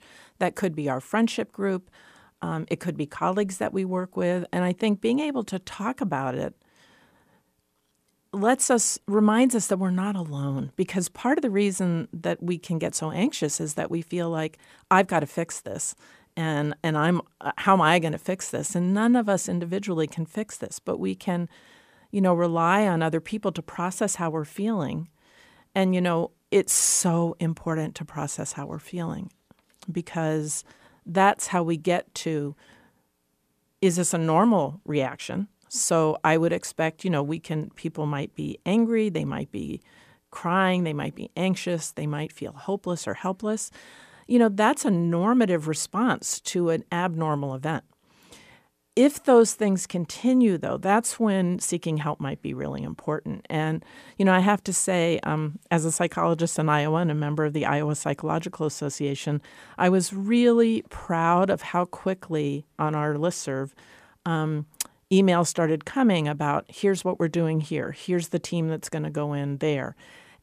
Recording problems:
none

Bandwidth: 15 kHz